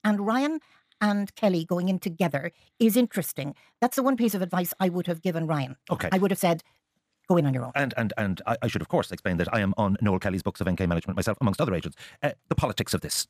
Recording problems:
wrong speed, natural pitch; too fast; 1.6 times normal speed

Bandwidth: 14.5 kHz